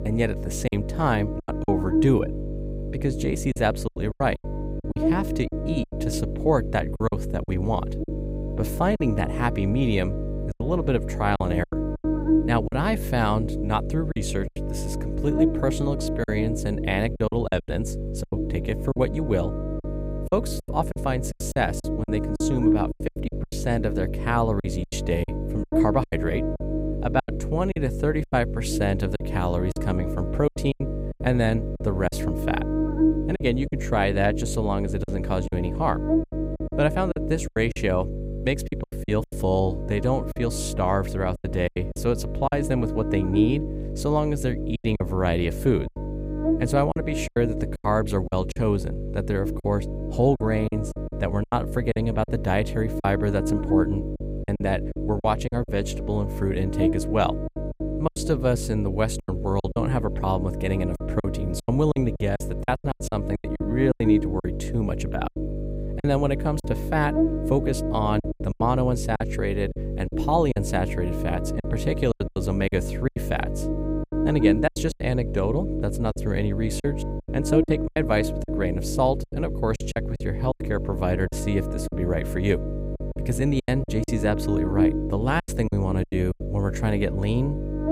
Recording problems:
electrical hum; loud; throughout; 50 Hz, 5 dB below the speech
choppy; very; 10% of the speech affected

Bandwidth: 15.5 kHz